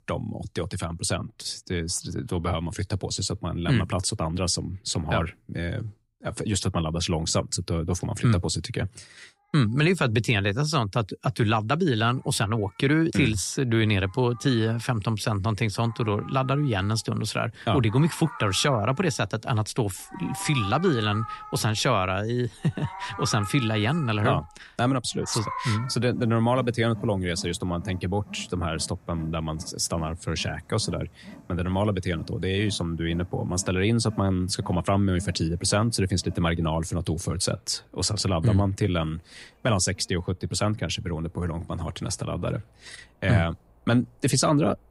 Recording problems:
animal sounds; noticeable; throughout; 15 dB below the speech

